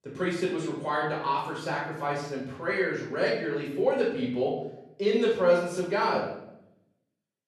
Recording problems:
off-mic speech; far
room echo; noticeable; dies away in 0.7 s

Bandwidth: 13.5 kHz